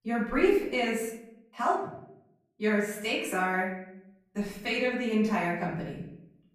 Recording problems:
off-mic speech; far
room echo; noticeable; dies away in 0.7 s

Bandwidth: 14.5 kHz